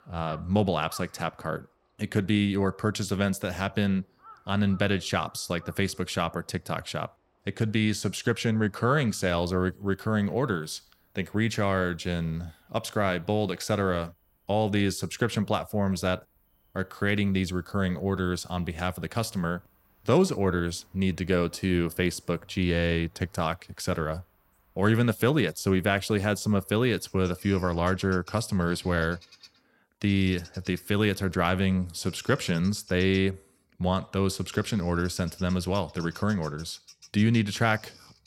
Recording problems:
animal sounds; faint; throughout; 25 dB below the speech

